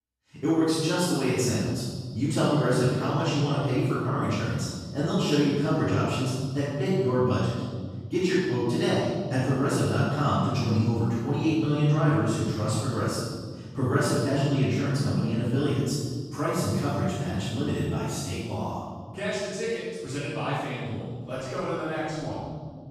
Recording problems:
room echo; strong; dies away in 1.8 s
off-mic speech; far

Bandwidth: 14.5 kHz